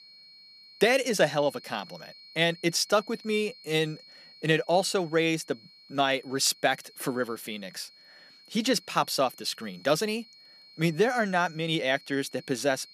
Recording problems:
high-pitched whine; faint; throughout; 4.5 kHz, 20 dB below the speech

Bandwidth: 14.5 kHz